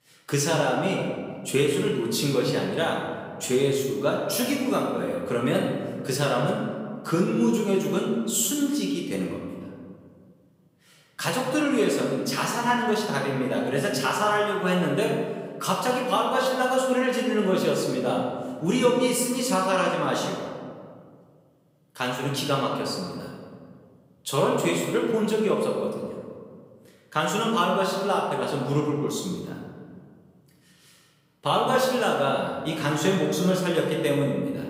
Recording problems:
off-mic speech; far
room echo; noticeable; dies away in 1.6 s

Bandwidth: 15.5 kHz